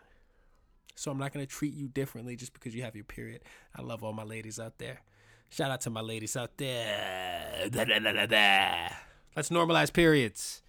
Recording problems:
none

